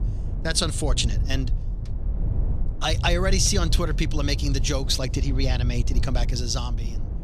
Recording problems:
low rumble; noticeable; throughout; 15 dB below the speech

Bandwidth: 14 kHz